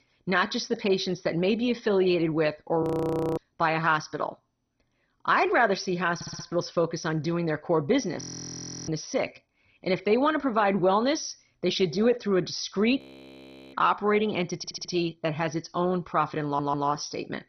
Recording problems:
garbled, watery; badly; nothing above 6 kHz
audio freezing; at 3 s for 0.5 s, at 8 s for 0.5 s and at 13 s for 0.5 s
audio stuttering; at 6 s, at 15 s and at 16 s

